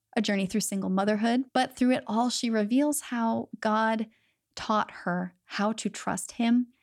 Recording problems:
none

